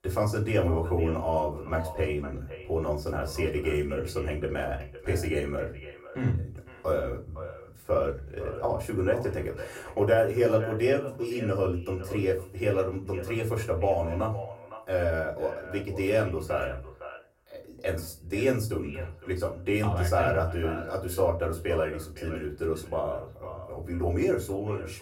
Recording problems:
off-mic speech; far
echo of what is said; noticeable; throughout; 510 ms later, 15 dB below the speech
room echo; very slight; dies away in 0.3 s

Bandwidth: 16 kHz